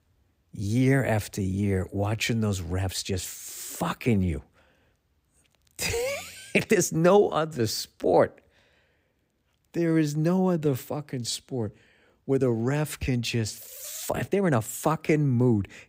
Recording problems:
uneven, jittery; strongly; from 0.5 to 15 s

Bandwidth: 15.5 kHz